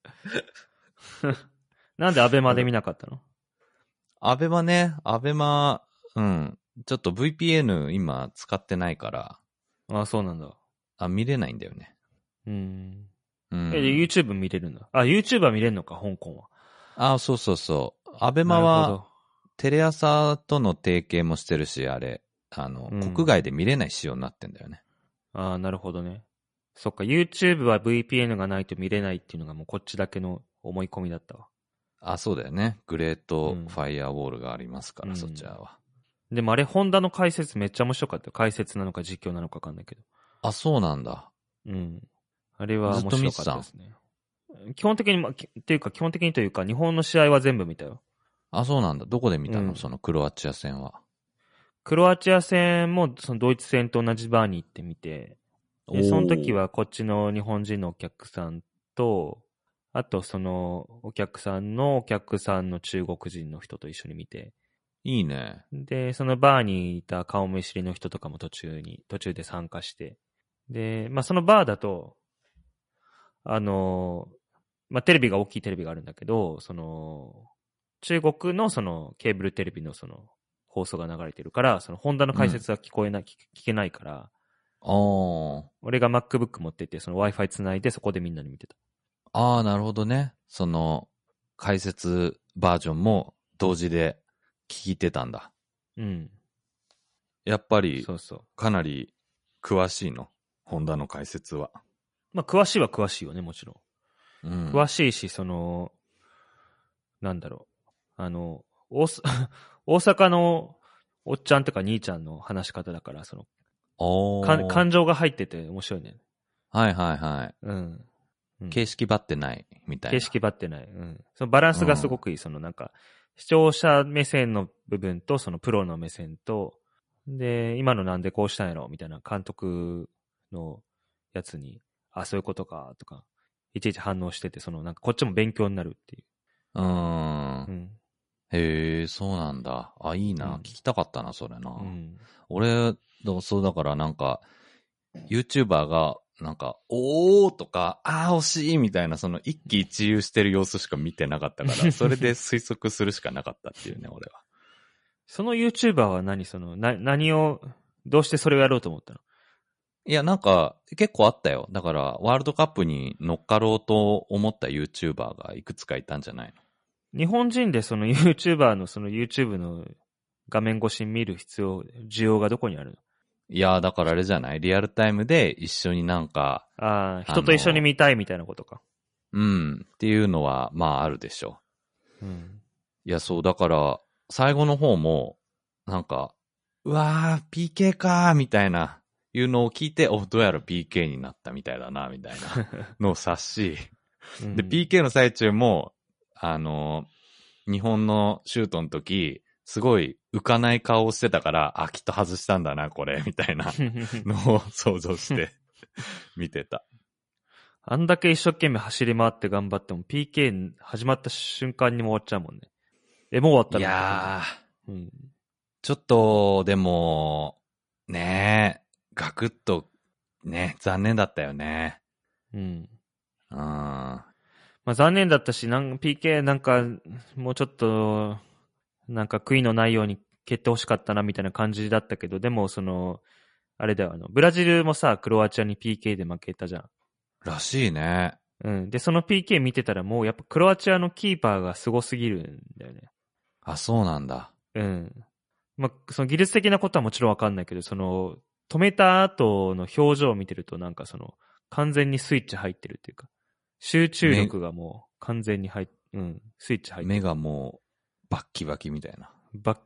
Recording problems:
garbled, watery; slightly; nothing above 10.5 kHz

